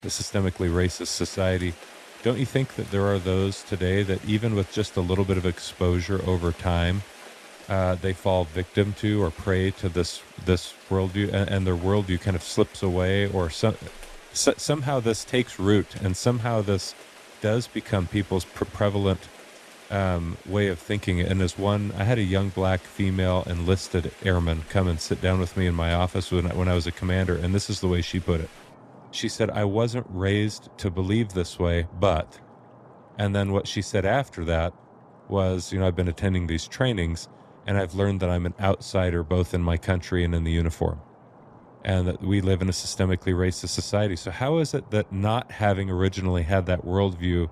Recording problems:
rain or running water; faint; throughout; 20 dB below the speech

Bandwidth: 14 kHz